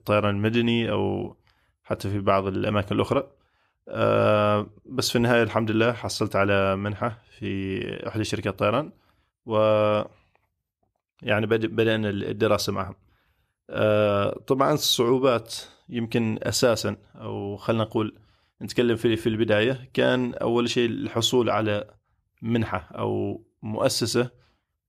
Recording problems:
none

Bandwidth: 14.5 kHz